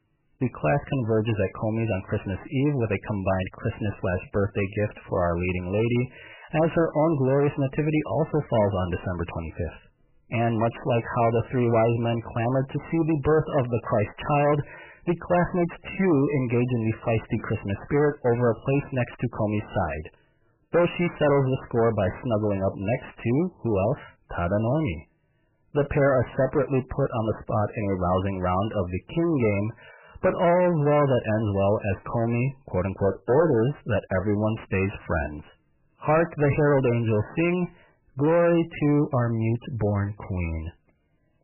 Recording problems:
distortion; heavy; 7 dB below the speech
garbled, watery; badly; nothing above 3 kHz

